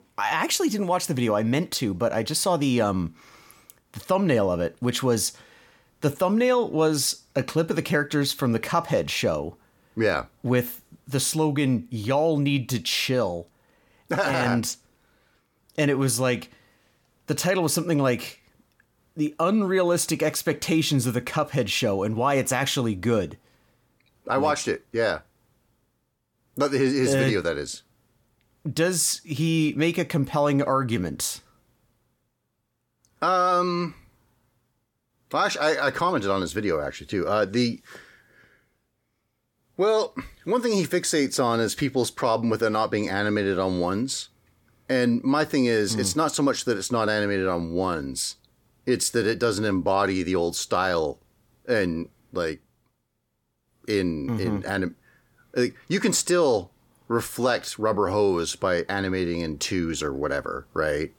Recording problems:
none

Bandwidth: 17.5 kHz